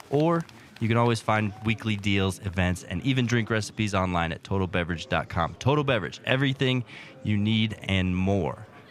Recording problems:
chatter from many people; faint; throughout; 25 dB below the speech

